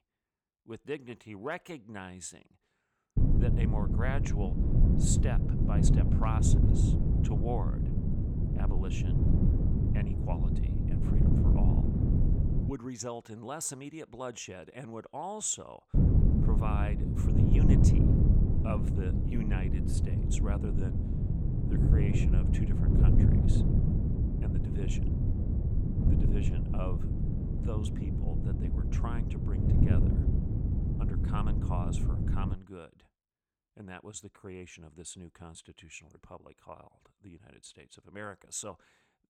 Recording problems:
wind noise on the microphone; heavy; from 3 to 13 s and from 16 to 33 s; 2 dB above the speech

